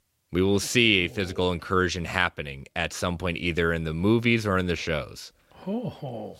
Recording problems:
none

